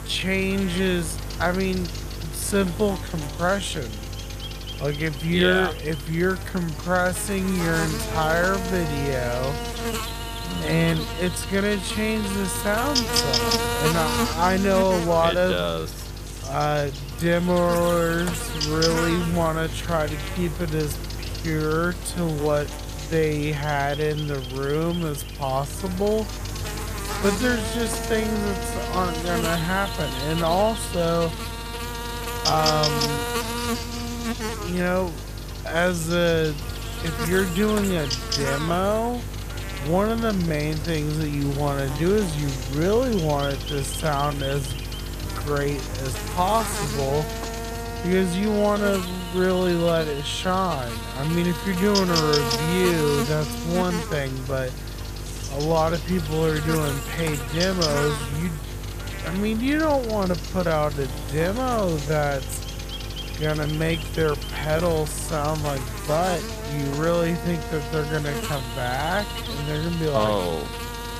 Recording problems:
wrong speed, natural pitch; too slow; 0.5 times normal speed
electrical hum; loud; throughout; 50 Hz, 5 dB below the speech

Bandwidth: 14.5 kHz